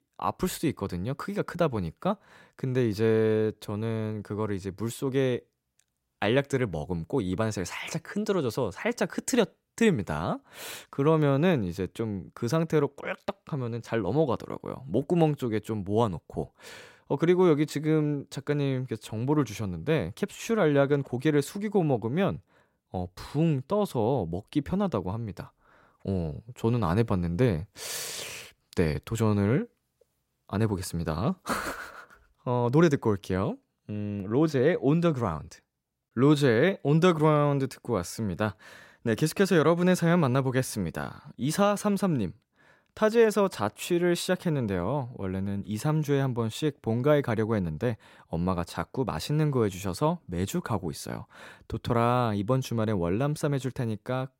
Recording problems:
none

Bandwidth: 16 kHz